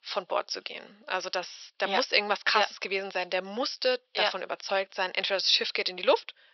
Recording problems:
thin; very; fading below 500 Hz
high frequencies cut off; noticeable; nothing above 5.5 kHz

